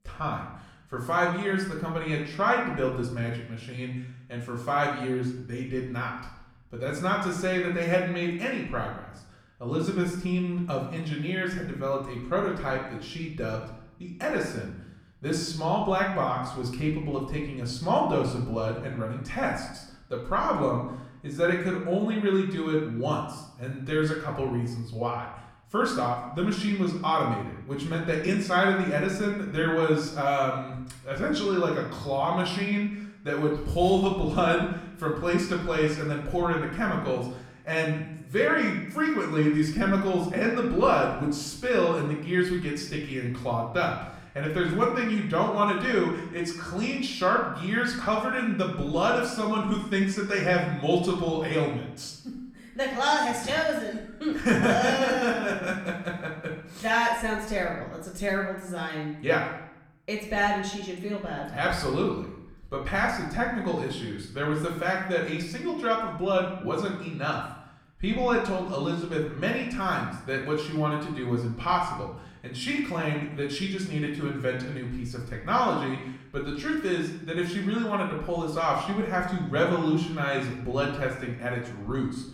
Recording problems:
off-mic speech; far
room echo; noticeable; dies away in 0.7 s

